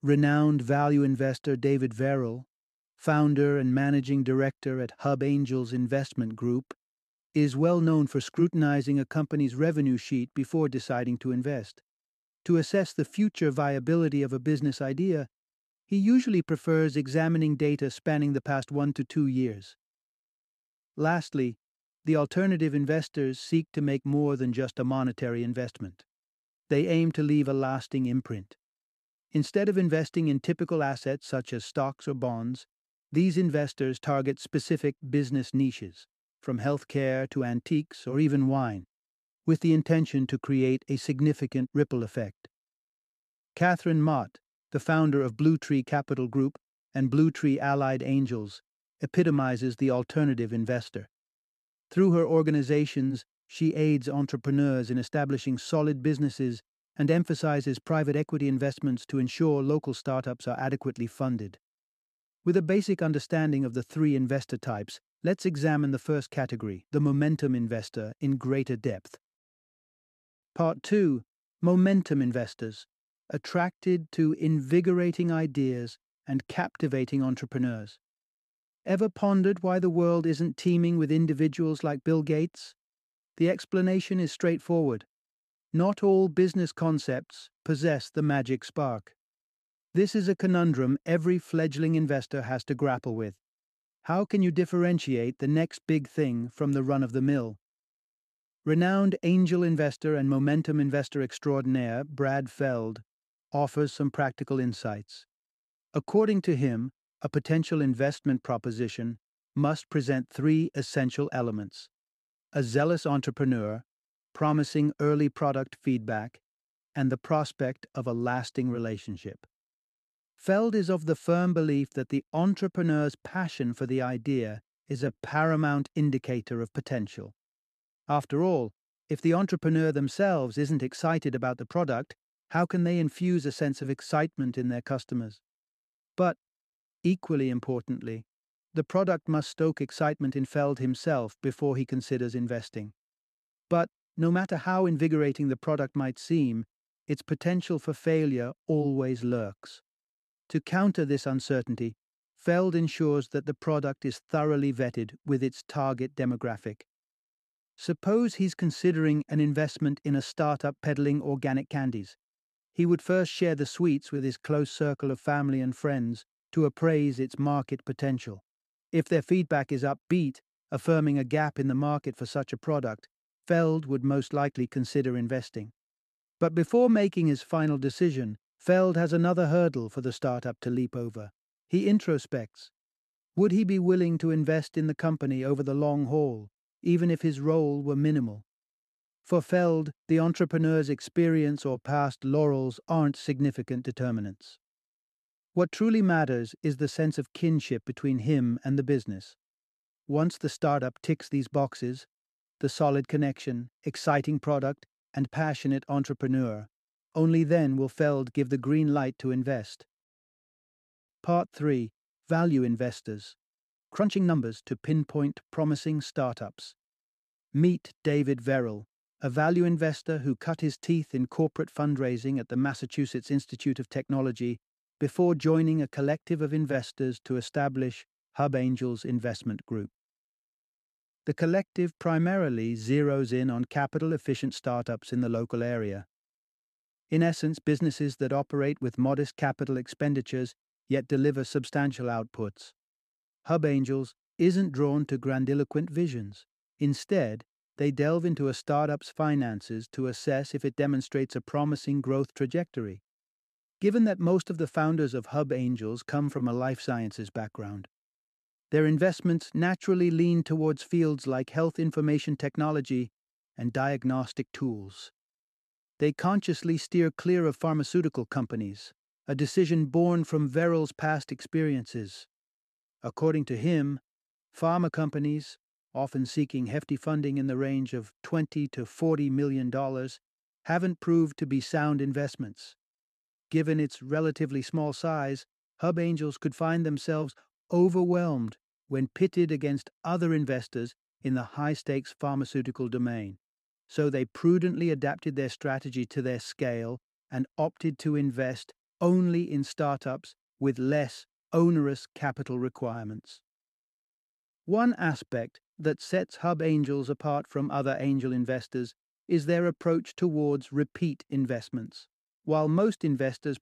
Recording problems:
uneven, jittery; strongly; from 7.5 s to 3:35

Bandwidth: 13.5 kHz